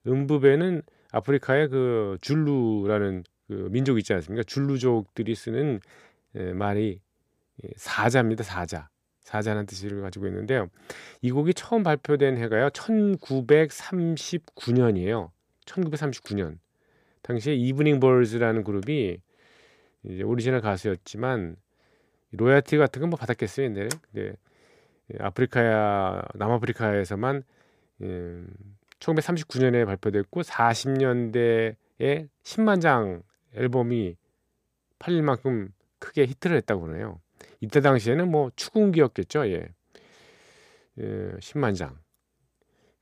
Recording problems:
none

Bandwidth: 15 kHz